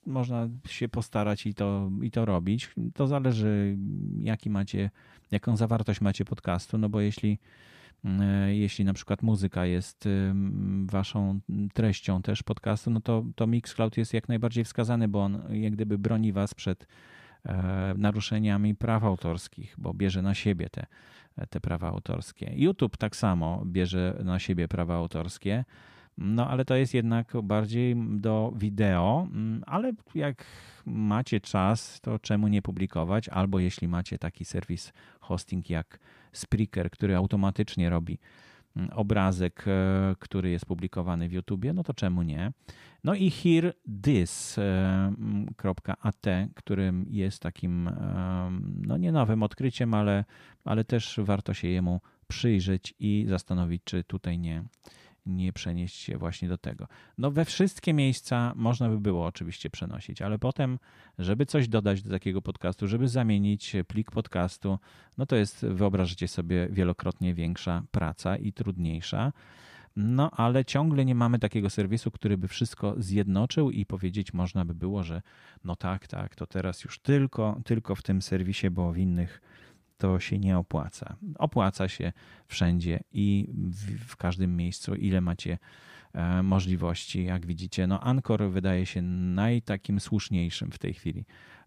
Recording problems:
none

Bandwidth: 15 kHz